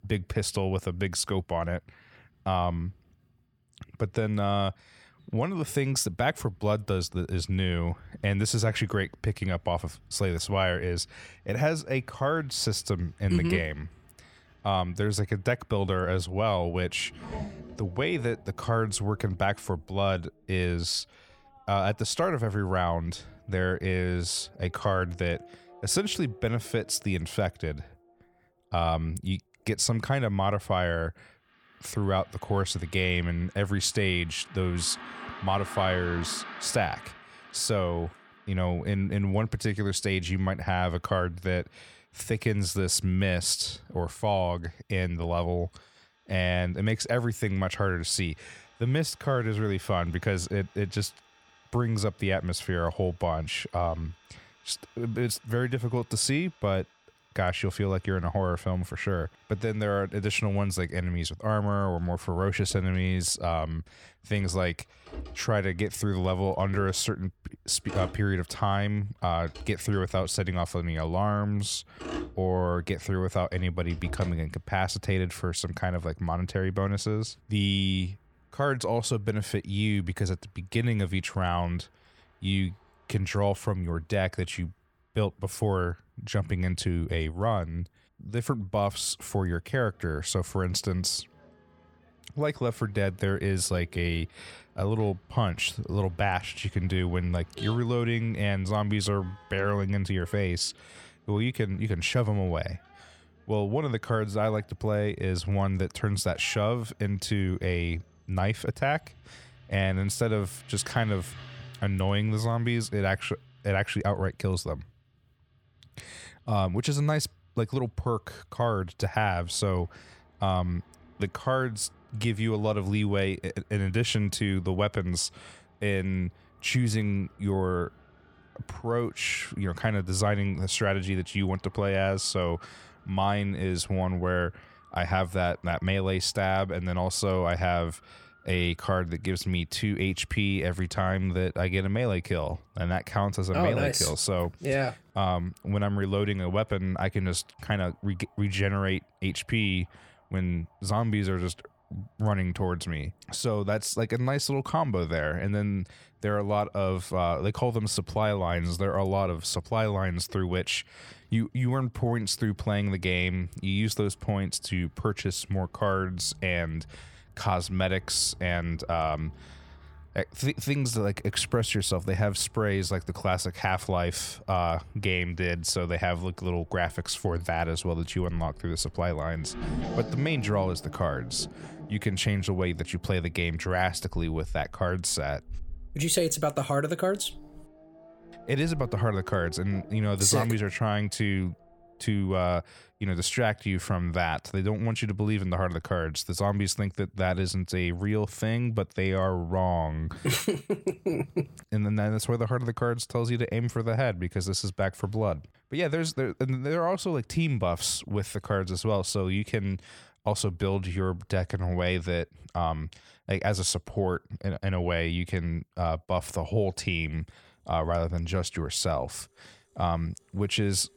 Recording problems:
traffic noise; noticeable; throughout; 20 dB below the speech

